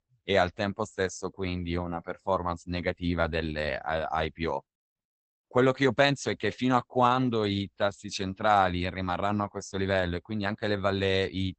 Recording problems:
garbled, watery; badly; nothing above 8 kHz

